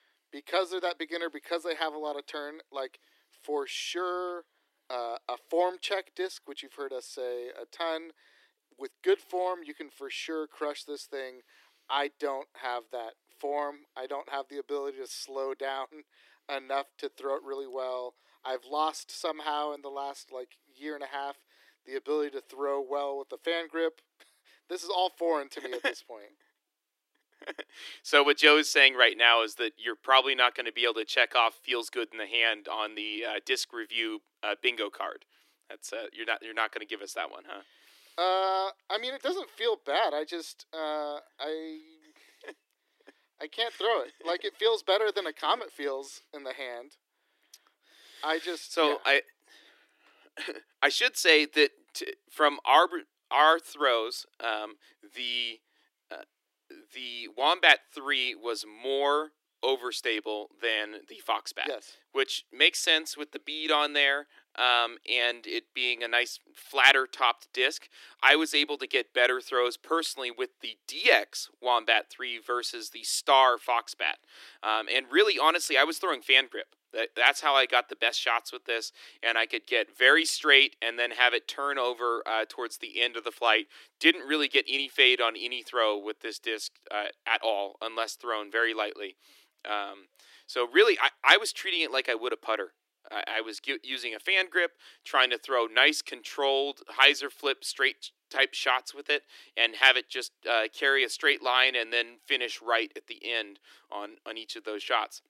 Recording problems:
thin; very; fading below 300 Hz

